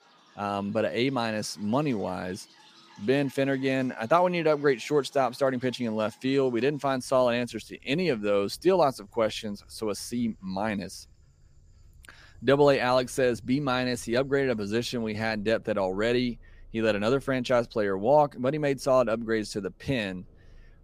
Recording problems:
animal sounds; faint; throughout; 30 dB below the speech

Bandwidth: 15 kHz